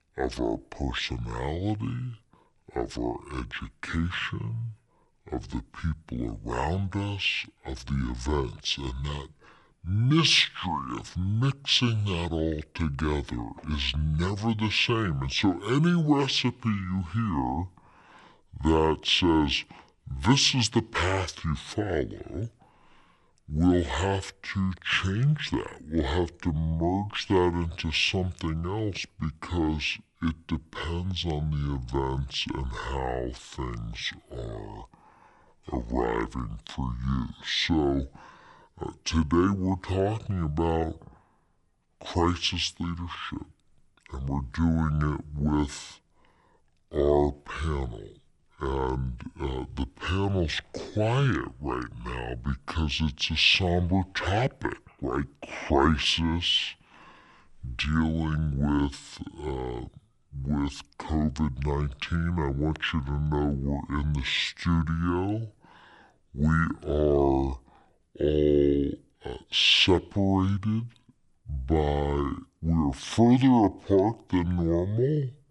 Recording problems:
wrong speed and pitch; too slow and too low; 0.6 times normal speed

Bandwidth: 11.5 kHz